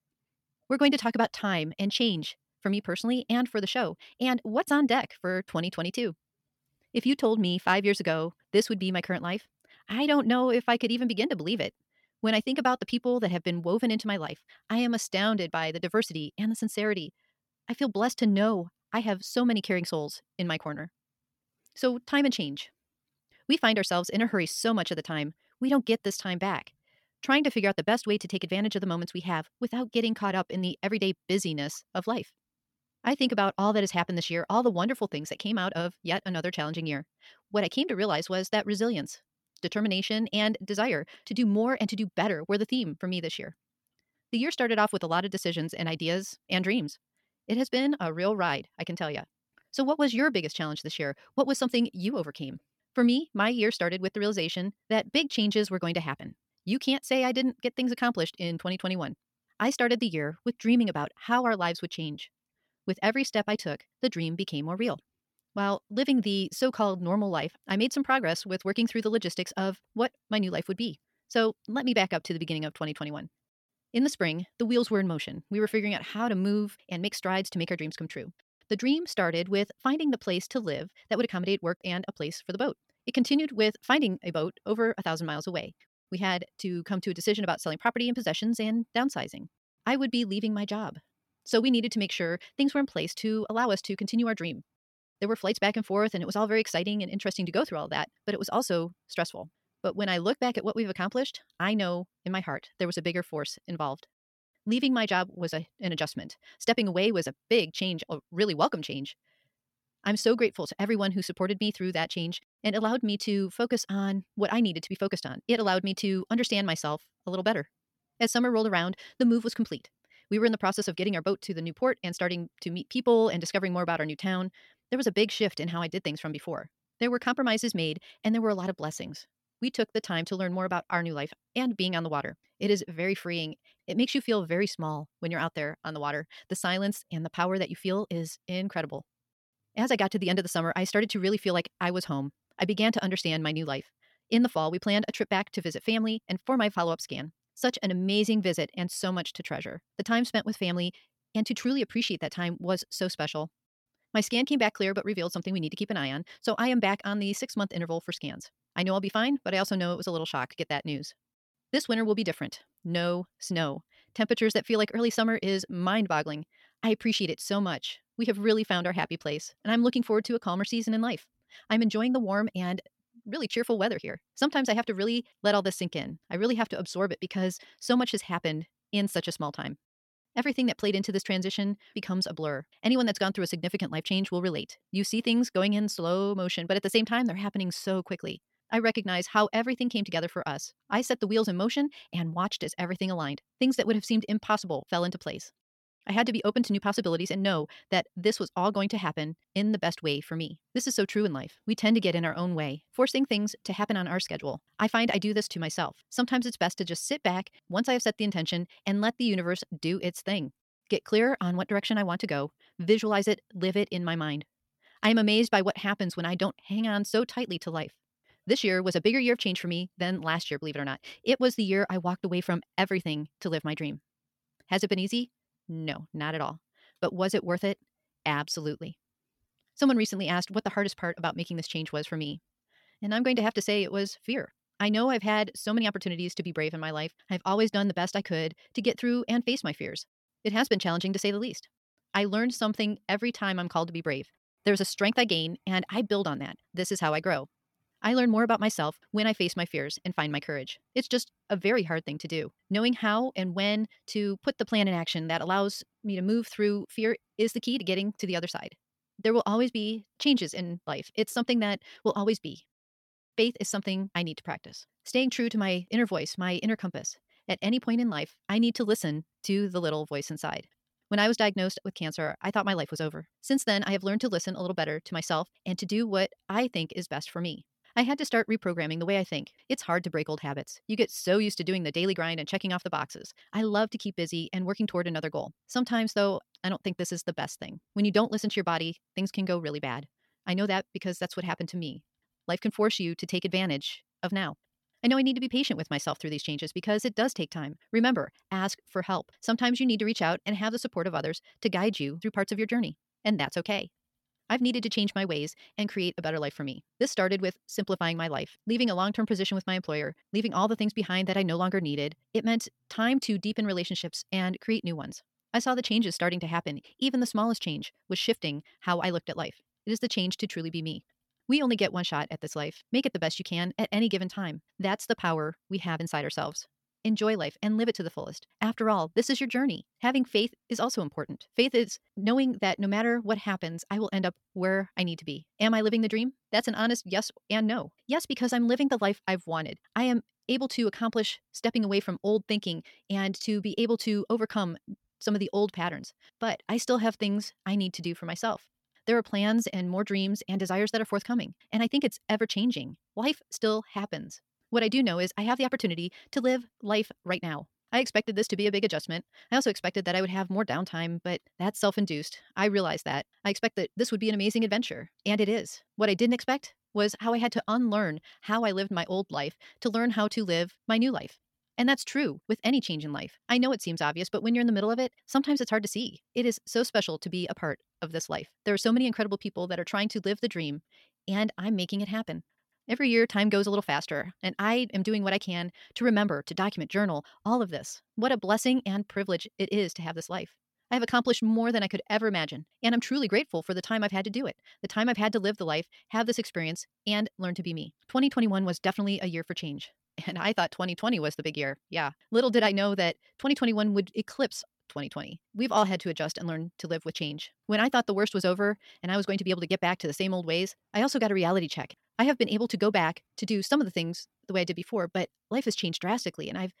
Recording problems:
wrong speed, natural pitch; too fast; 1.5 times normal speed

